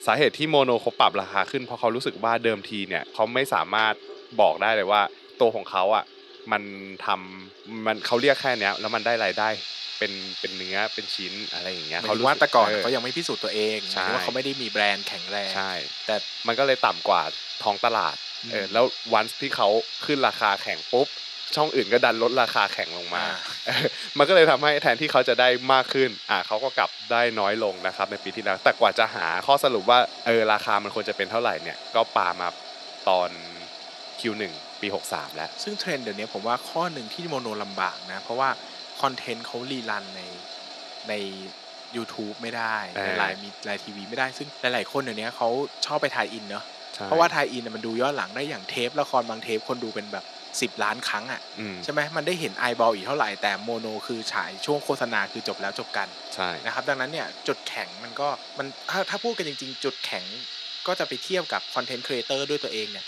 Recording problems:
thin; somewhat; fading below 300 Hz
household noises; loud; throughout; 10 dB below the speech

